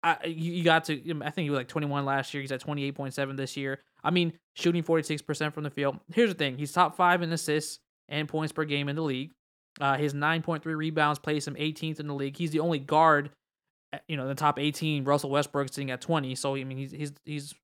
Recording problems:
none

